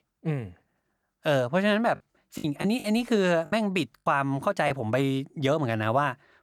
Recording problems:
choppy; very; from 2.5 to 4.5 s; 8% of the speech affected

